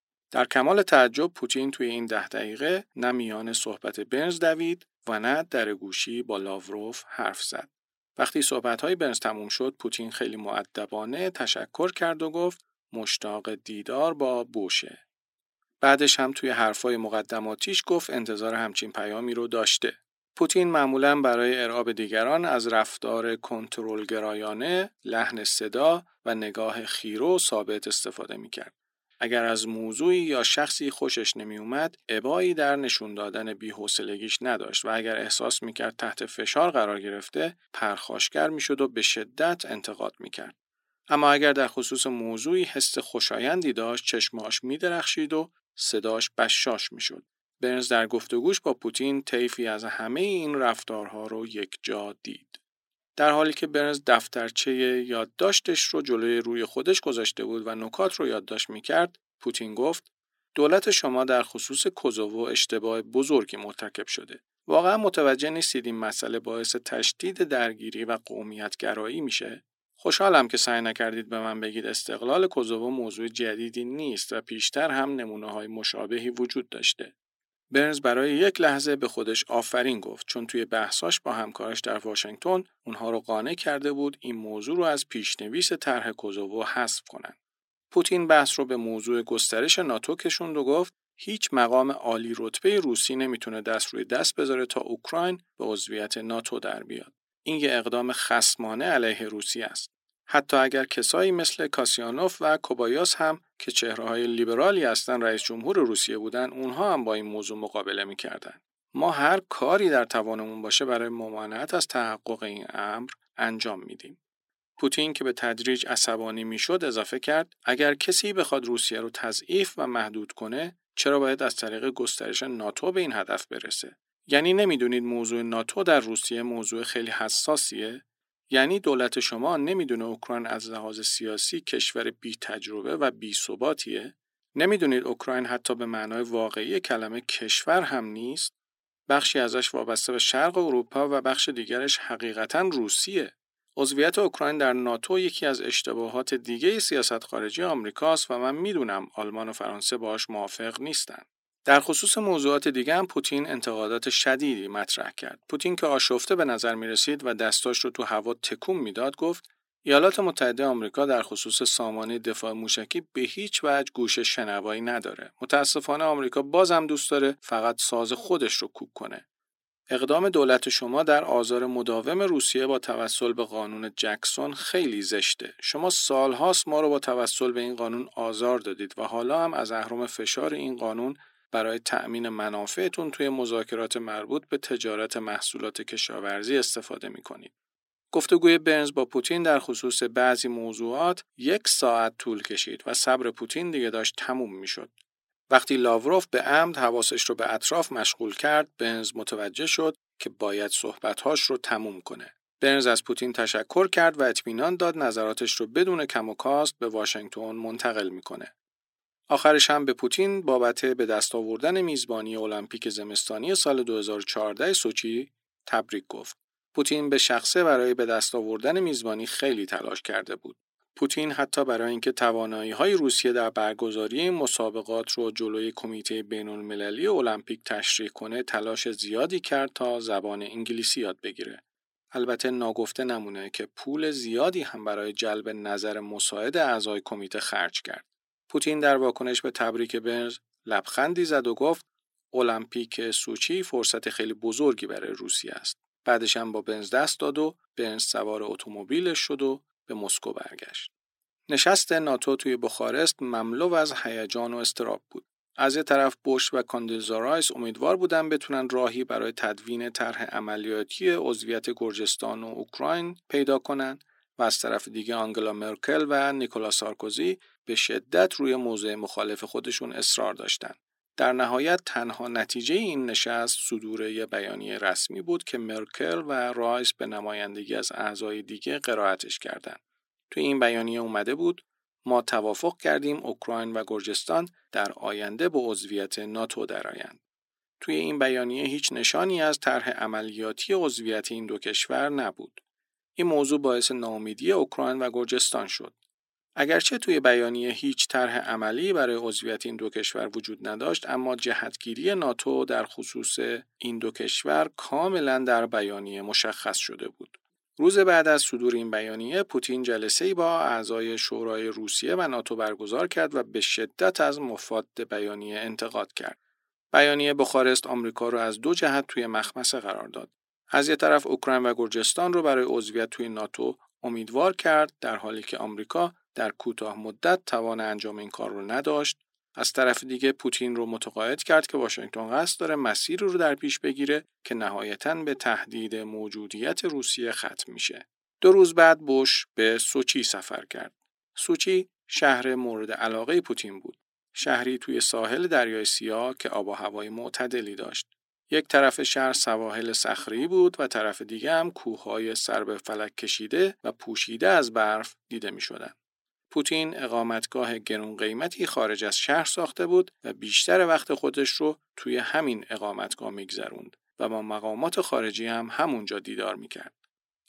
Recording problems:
thin; somewhat; fading below 300 Hz

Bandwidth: 16 kHz